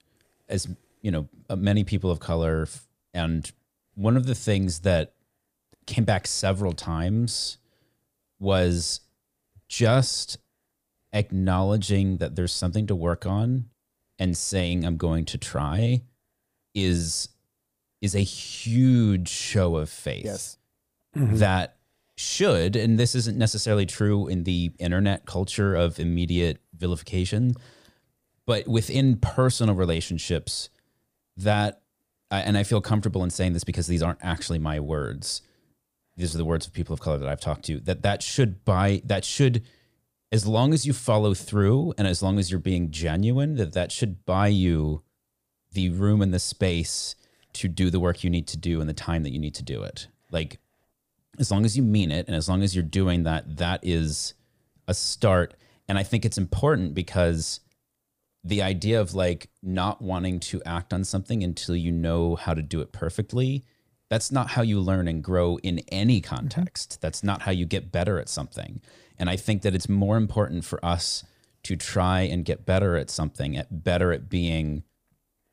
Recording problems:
none

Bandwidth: 15 kHz